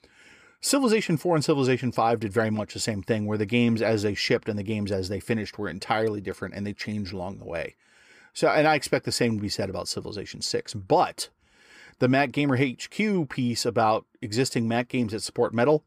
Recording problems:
none

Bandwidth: 15 kHz